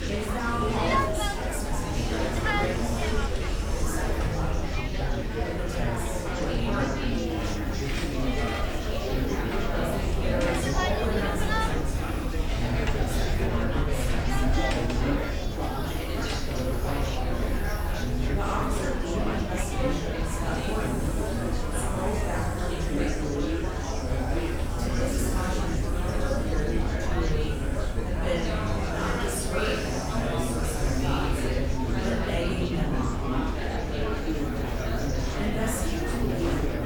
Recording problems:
off-mic speech; far
room echo; noticeable; dies away in 1 s
murmuring crowd; very loud; throughout; 3 dB above the speech
hiss; noticeable; throughout; 15 dB below the speech
low rumble; noticeable; throughout; 15 dB below the speech

